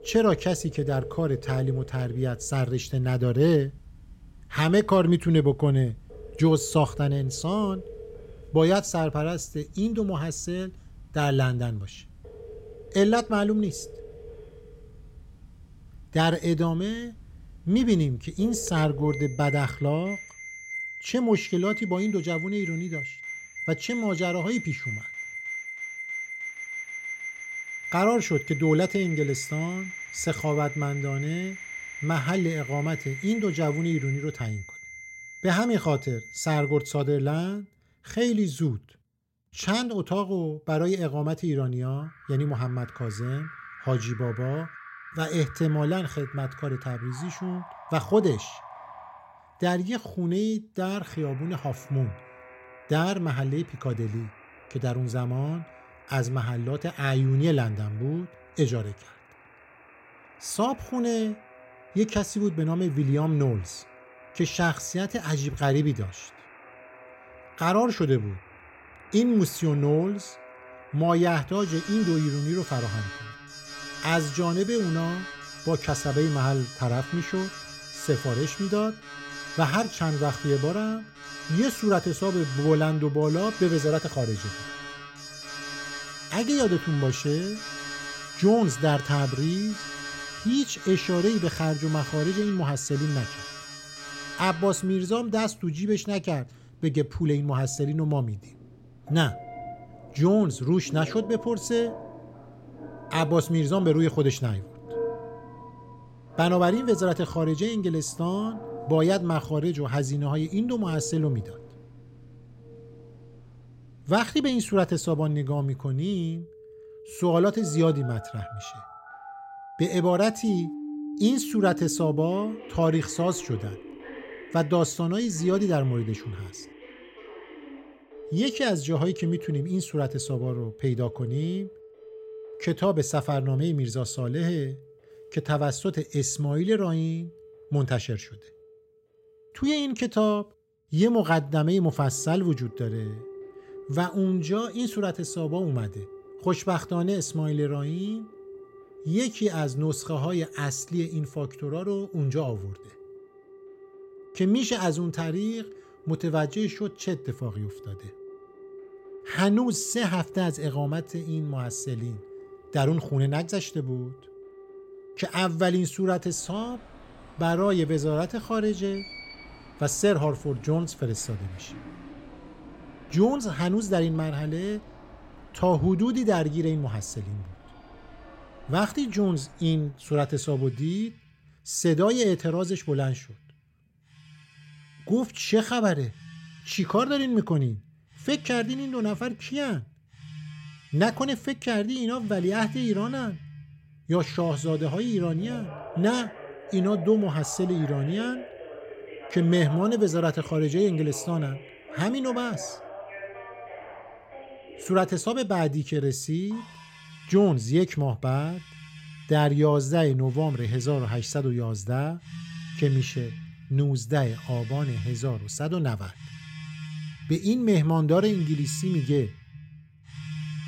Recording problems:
alarms or sirens; noticeable; throughout; 15 dB below the speech

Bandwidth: 16 kHz